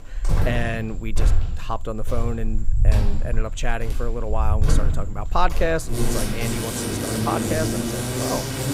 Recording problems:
animal sounds; very loud; throughout; 3 dB above the speech

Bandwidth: 15.5 kHz